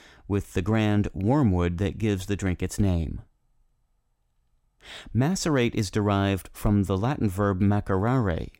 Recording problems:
none

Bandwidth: 16 kHz